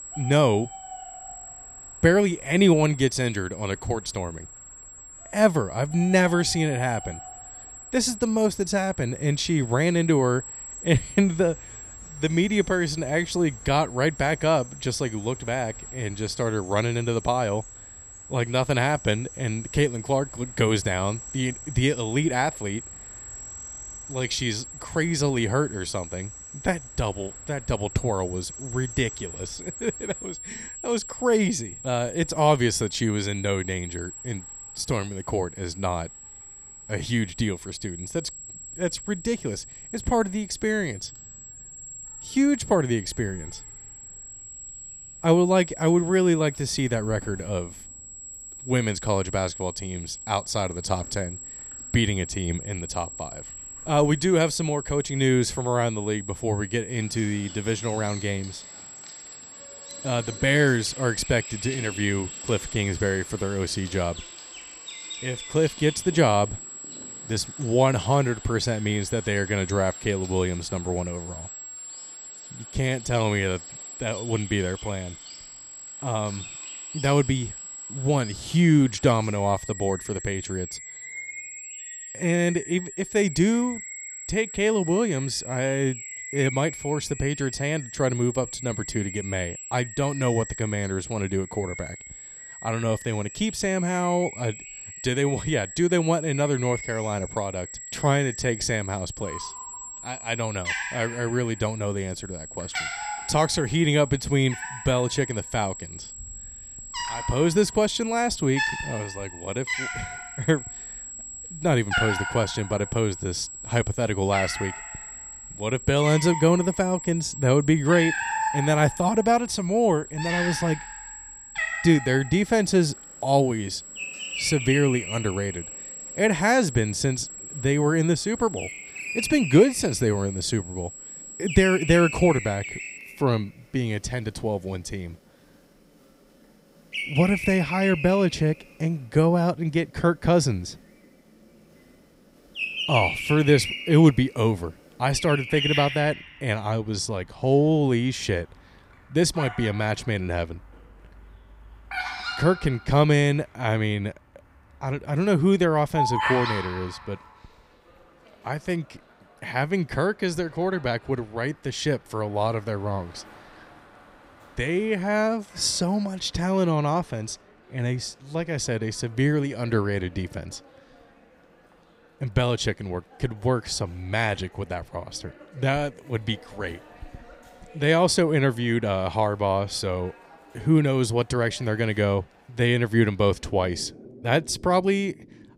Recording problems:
high-pitched whine; noticeable; until 2:13; 7.5 kHz, 15 dB below the speech
animal sounds; noticeable; throughout; 10 dB below the speech

